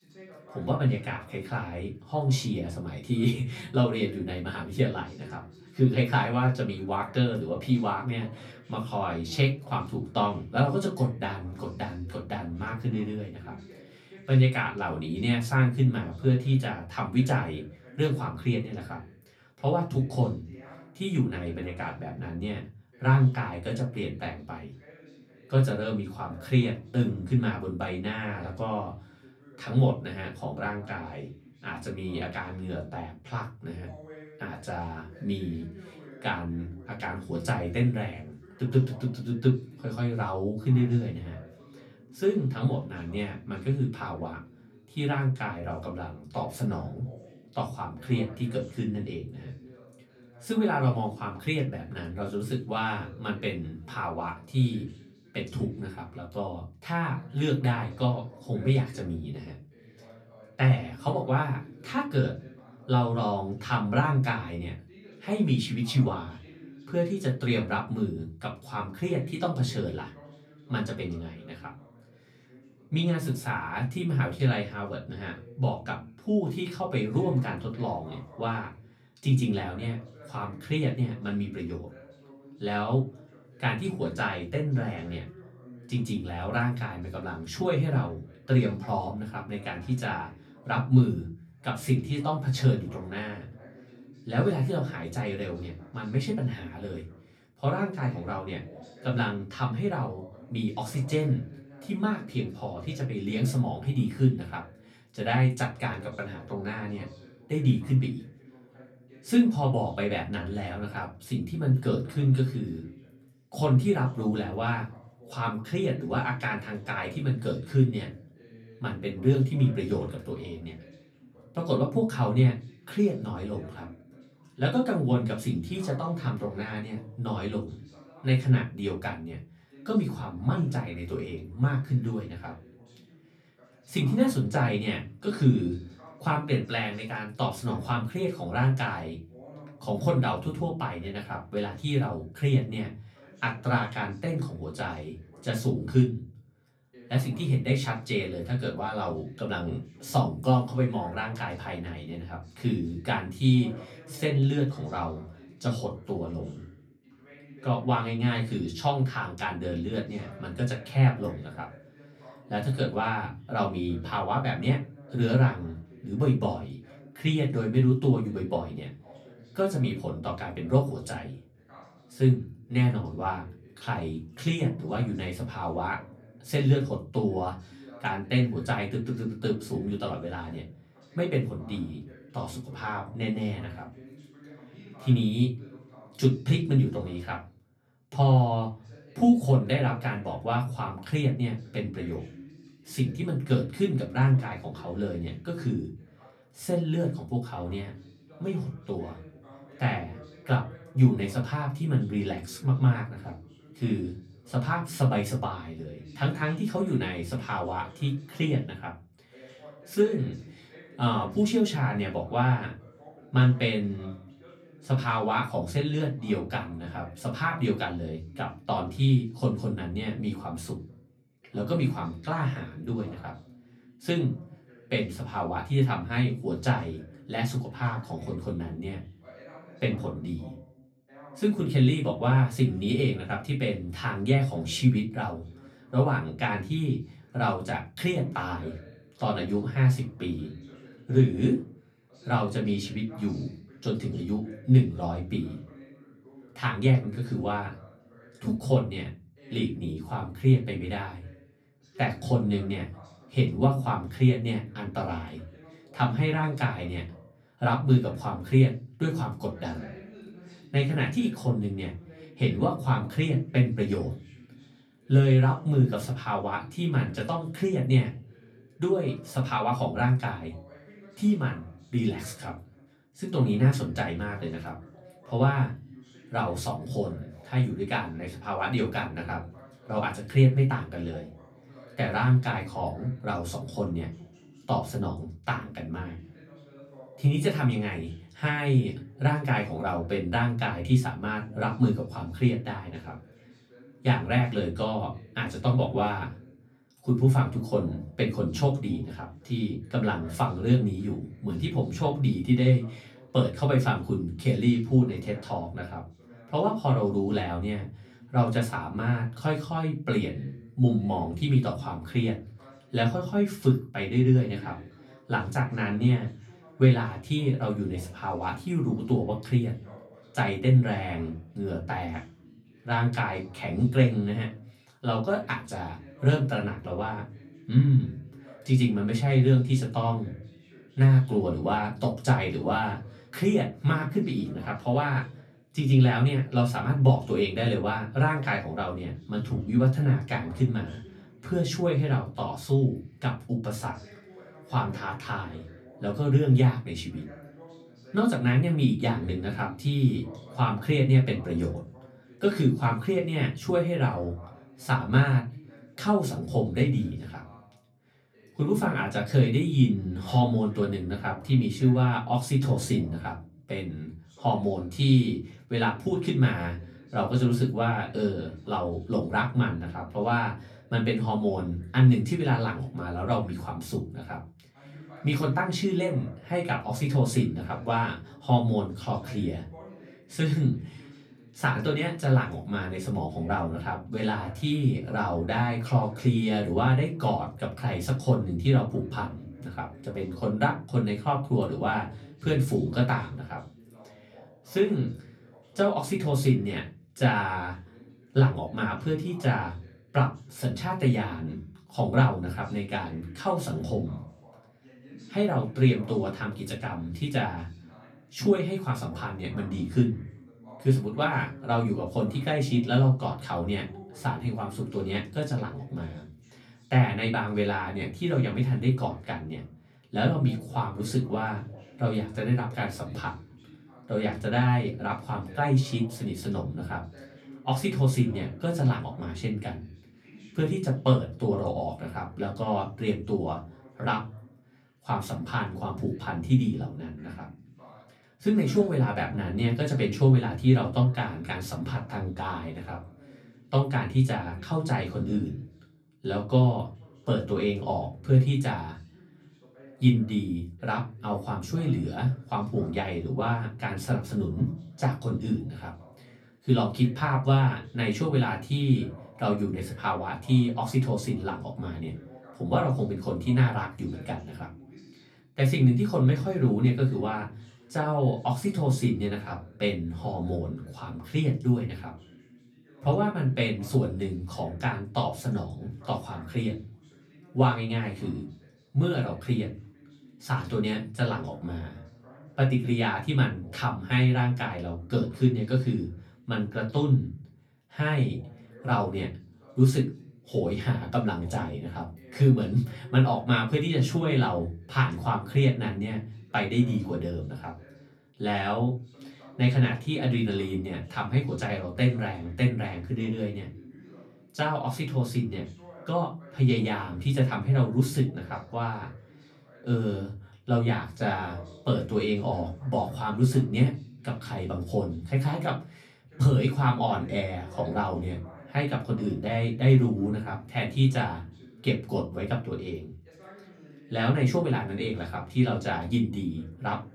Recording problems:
off-mic speech; far
room echo; very slight; dies away in 0.3 s
voice in the background; faint; throughout; 25 dB below the speech

